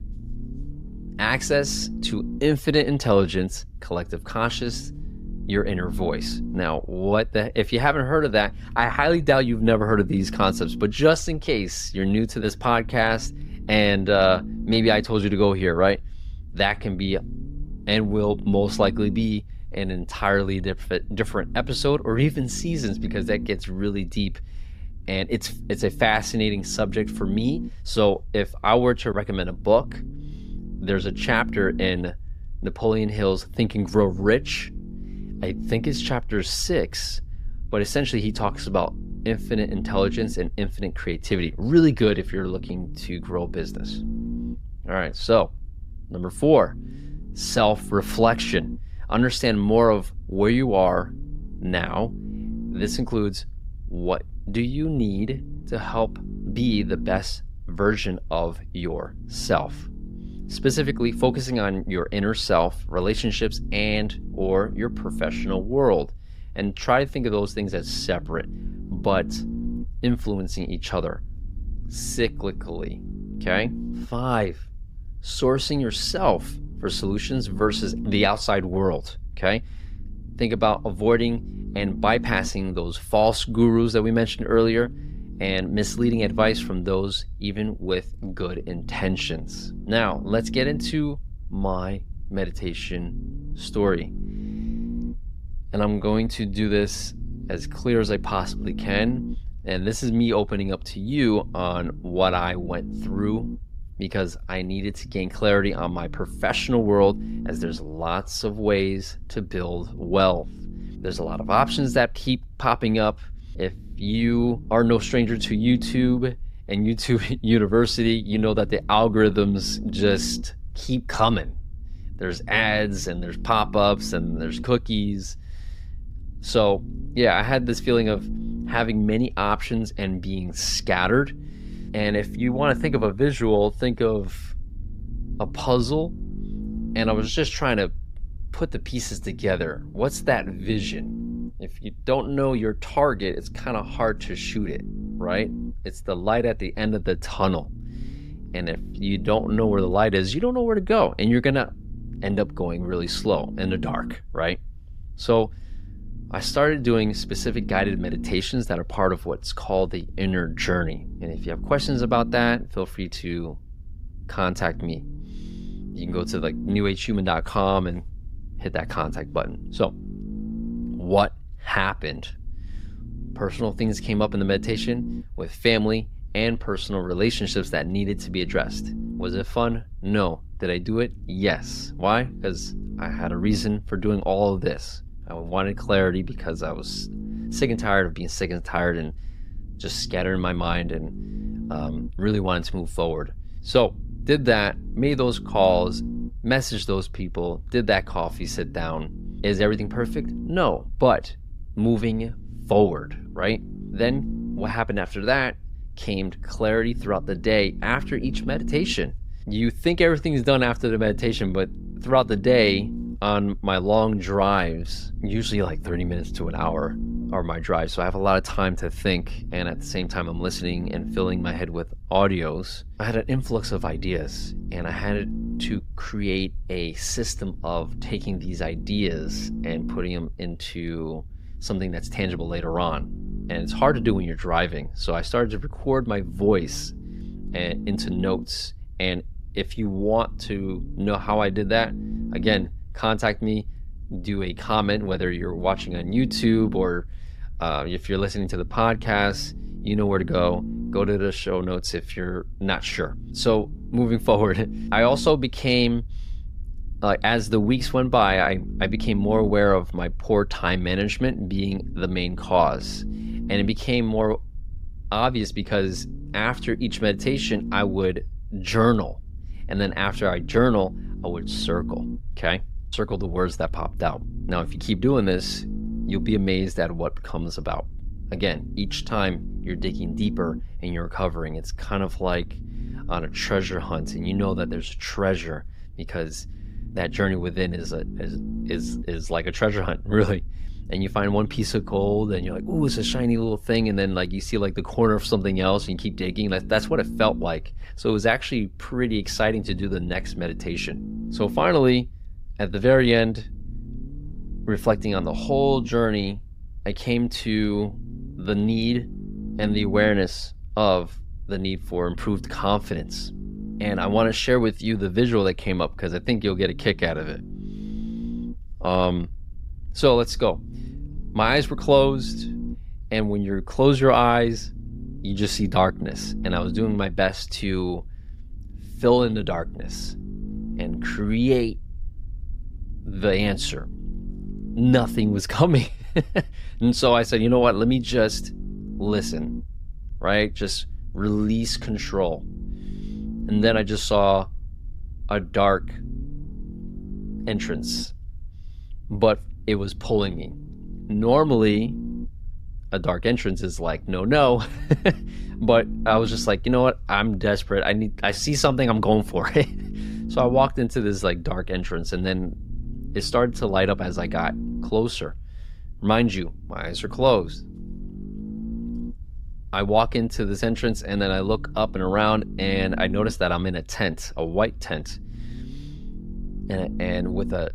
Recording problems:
low rumble; noticeable; throughout; 20 dB below the speech

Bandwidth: 15.5 kHz